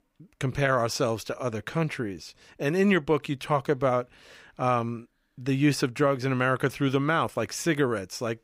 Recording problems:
none

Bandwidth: 15.5 kHz